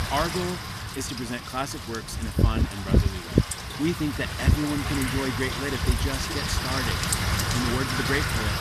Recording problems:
wind noise on the microphone; heavy; 2 dB above the speech

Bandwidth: 14 kHz